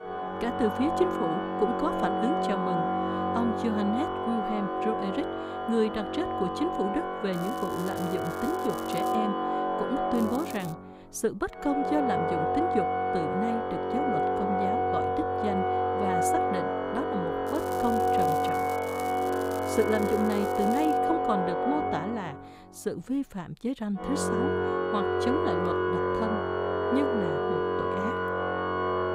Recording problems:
background music; very loud; throughout; 3 dB above the speech
crackling; noticeable; from 7.5 to 9 s, at 10 s and from 17 to 21 s; 15 dB below the speech

